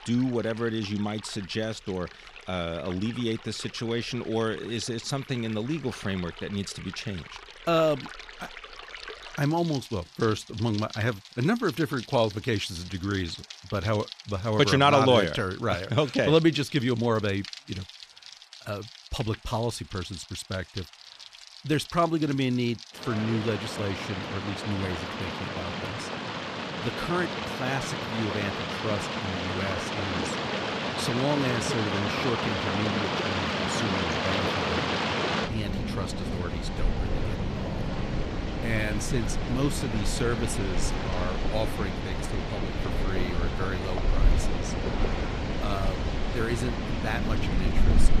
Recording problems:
rain or running water; loud; throughout; 2 dB below the speech

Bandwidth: 14.5 kHz